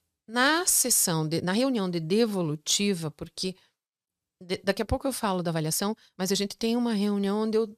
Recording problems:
uneven, jittery; strongly; from 1.5 to 6.5 s

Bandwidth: 14.5 kHz